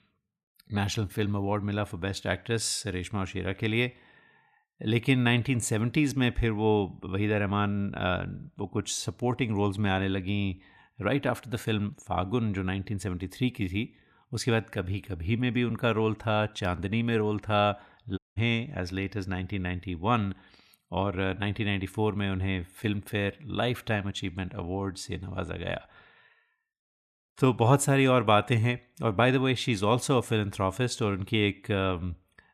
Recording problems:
audio cutting out; at 18 s

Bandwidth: 14.5 kHz